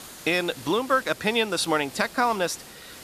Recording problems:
hiss; noticeable; throughout; 15 dB below the speech

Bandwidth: 14.5 kHz